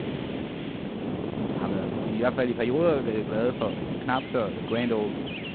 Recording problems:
phone-call audio; poor line; nothing above 4 kHz
wind noise on the microphone; heavy; 8 dB below the speech
animal sounds; noticeable; throughout; 20 dB below the speech
hiss; noticeable; throughout; 20 dB below the speech

